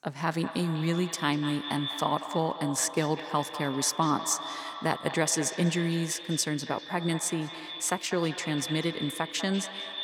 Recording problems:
echo of what is said; strong; throughout; 200 ms later, 9 dB below the speech

